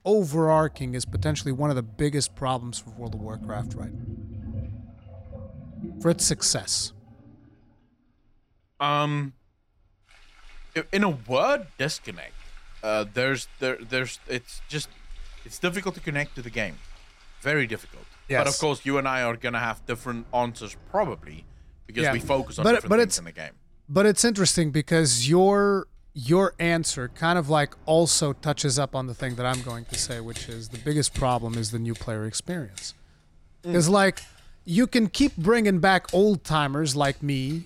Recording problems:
household noises; noticeable; throughout; 20 dB below the speech

